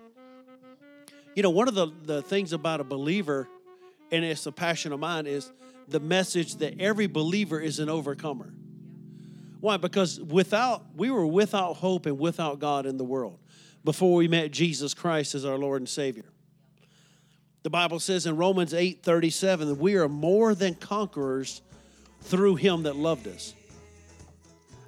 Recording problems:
background music; faint; throughout; 25 dB below the speech

